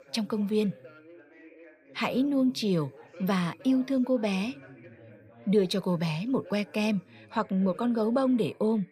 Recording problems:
background chatter; faint; throughout; 3 voices, 20 dB below the speech

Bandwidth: 14.5 kHz